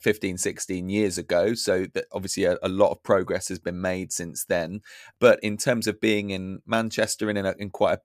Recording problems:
none

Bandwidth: 14.5 kHz